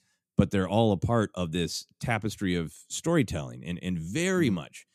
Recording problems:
none

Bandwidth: 14.5 kHz